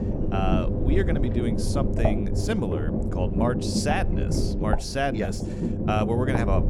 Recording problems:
low rumble; loud; throughout; 3 dB below the speech

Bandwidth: 18 kHz